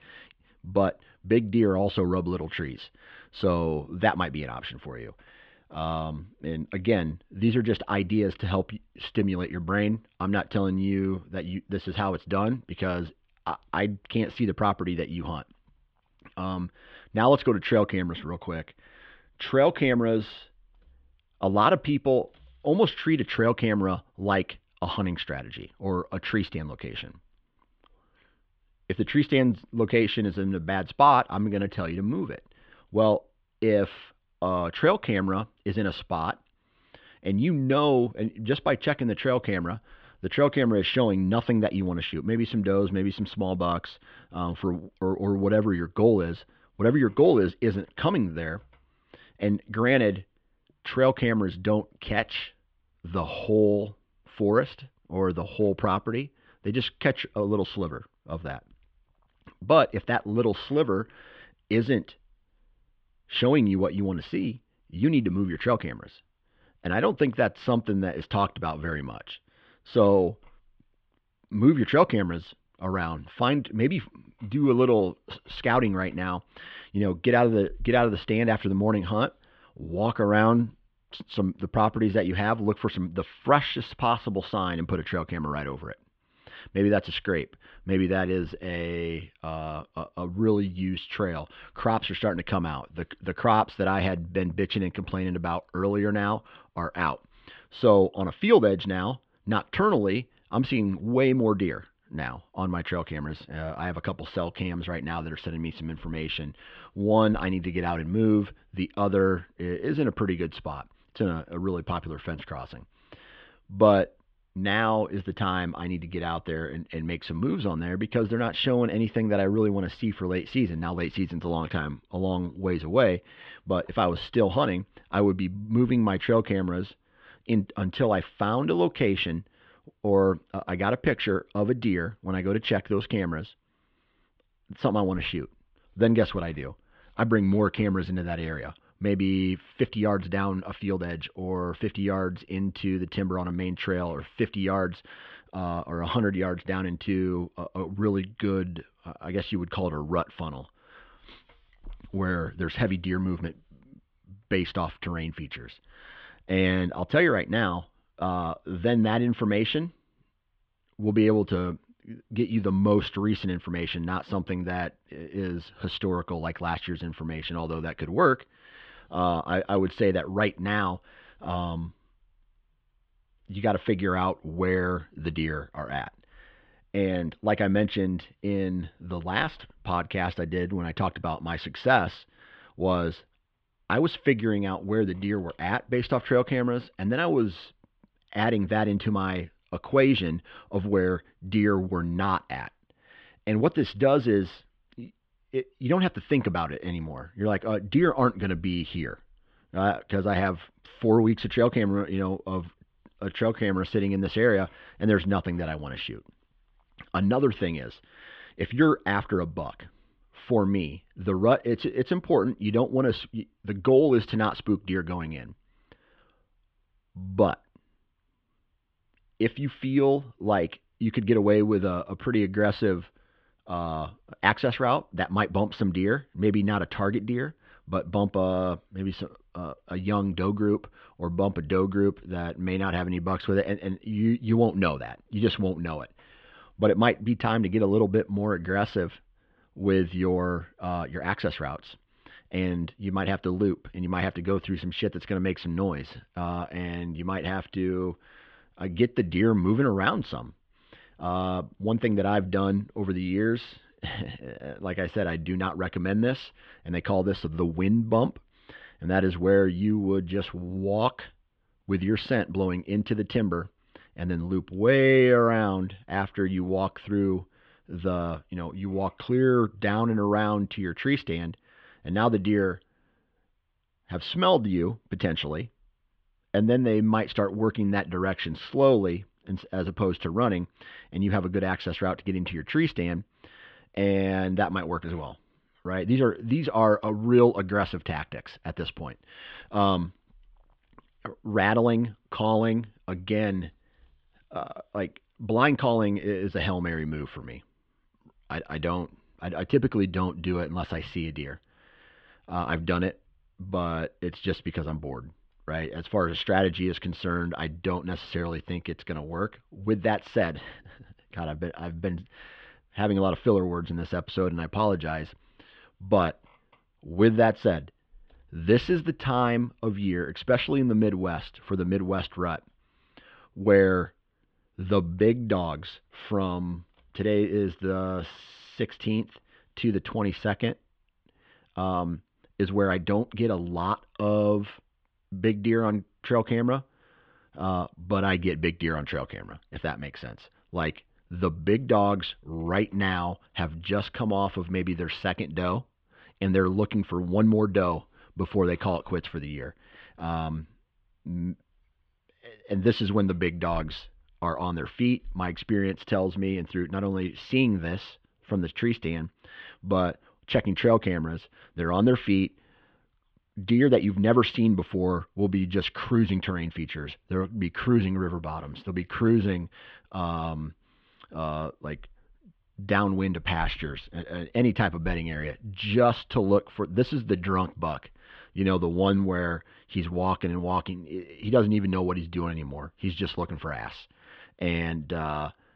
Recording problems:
muffled; very; fading above 3.5 kHz

